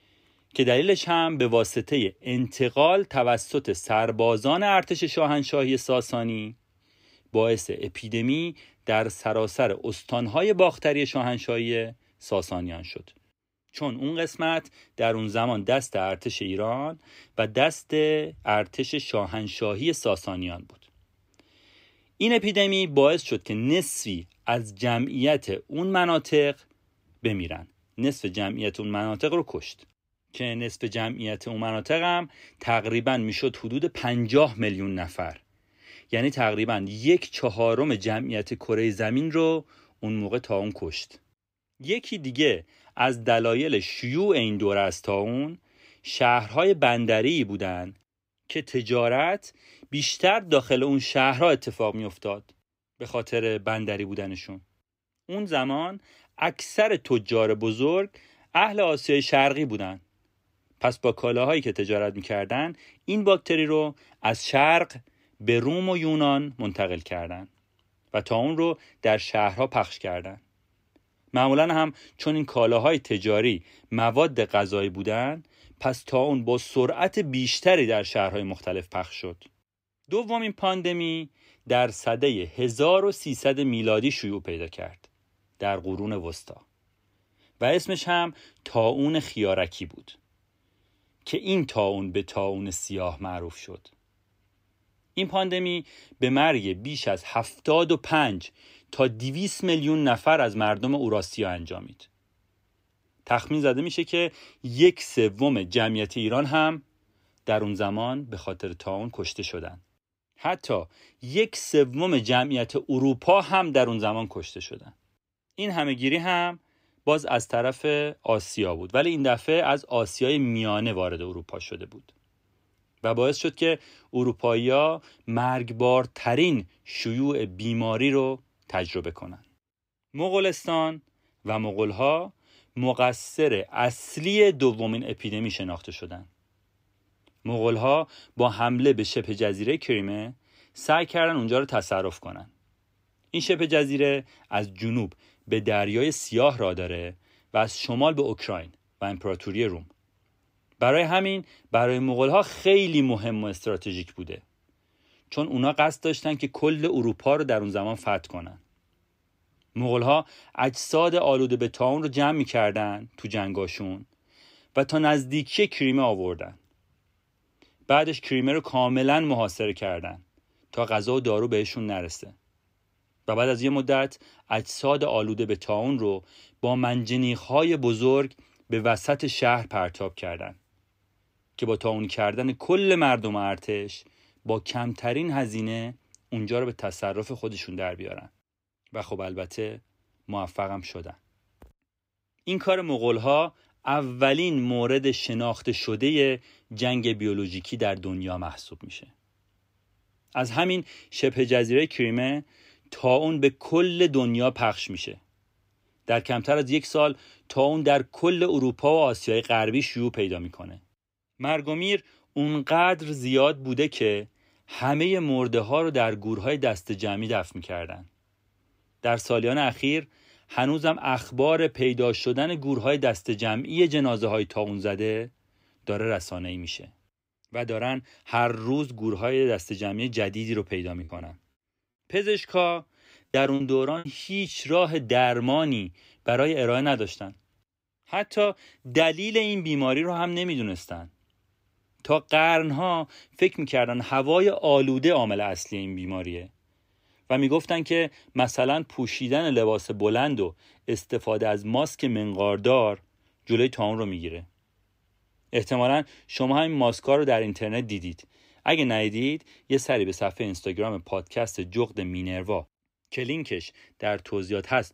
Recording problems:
choppy; very; from 3:51 to 3:54; 7% of the speech affected

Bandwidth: 15.5 kHz